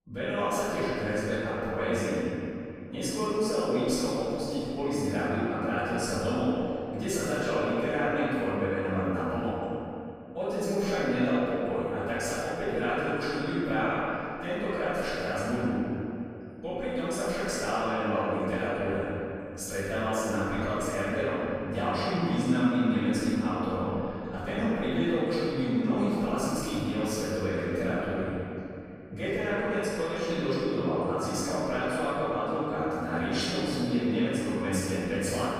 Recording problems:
room echo; strong; dies away in 2.8 s
off-mic speech; far

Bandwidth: 14.5 kHz